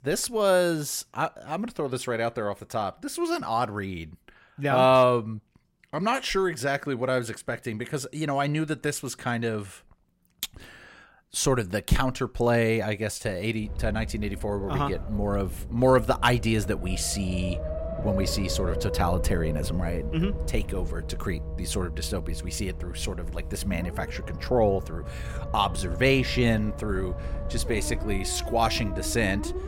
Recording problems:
low rumble; noticeable; from 14 s on; 10 dB below the speech

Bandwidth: 16 kHz